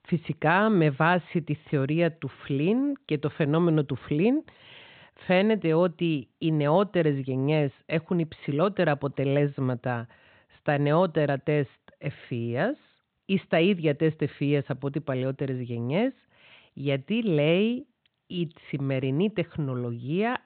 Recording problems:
high frequencies cut off; severe; nothing above 4 kHz

